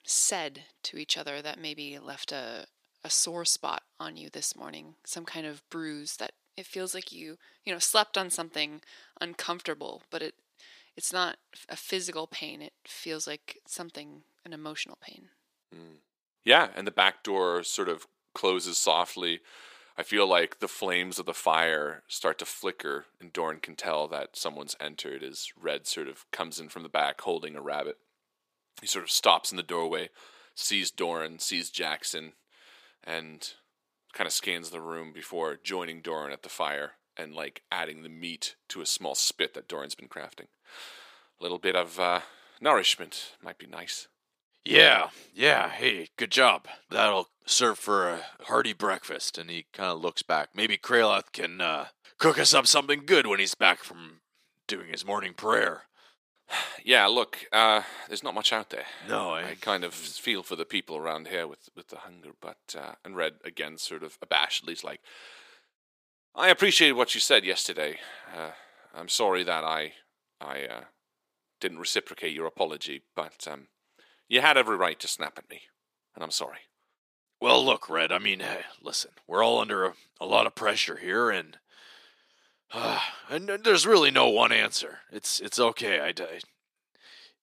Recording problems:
thin; somewhat; fading below 450 Hz

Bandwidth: 15 kHz